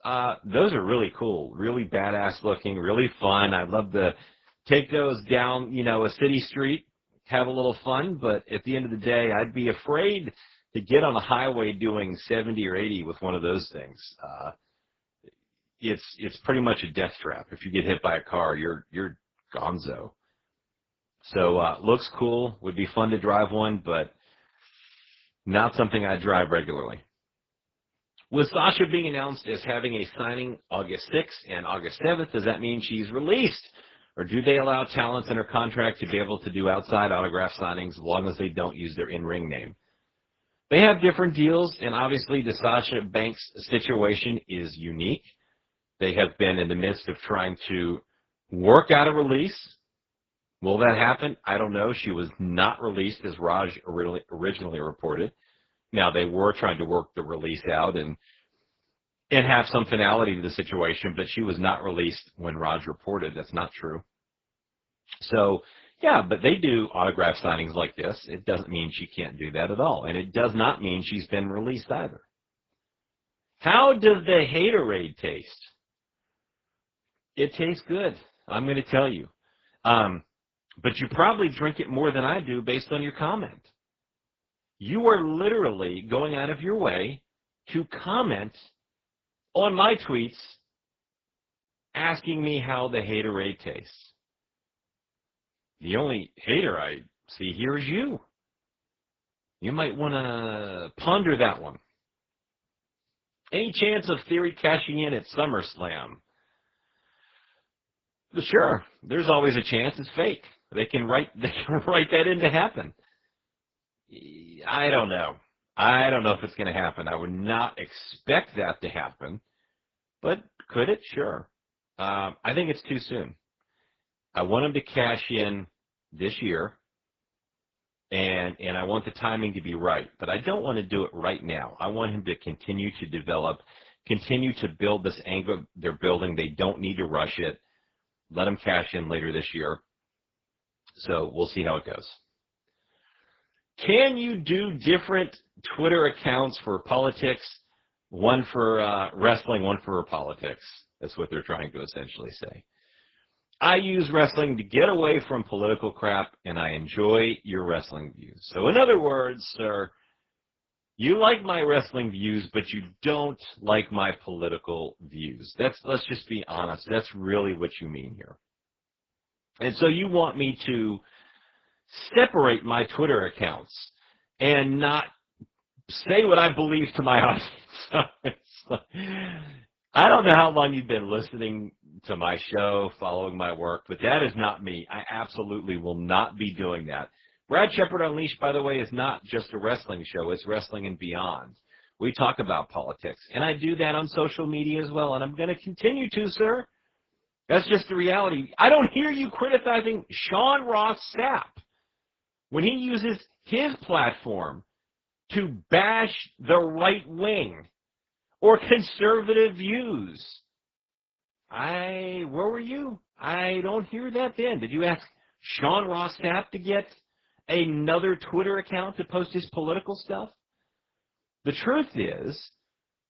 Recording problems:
garbled, watery; badly; nothing above 7.5 kHz

